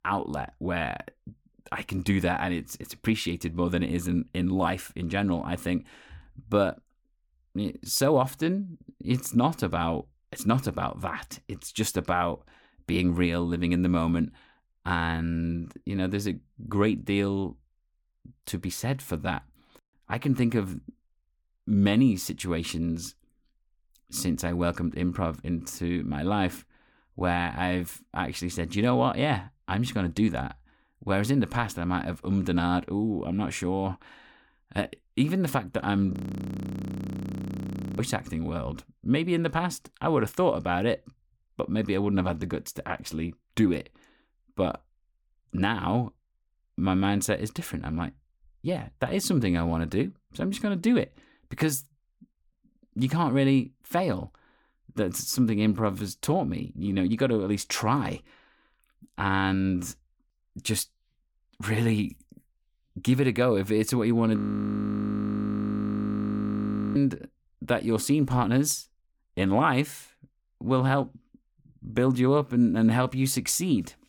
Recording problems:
audio freezing; at 36 s for 2 s and at 1:04 for 2.5 s

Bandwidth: 18.5 kHz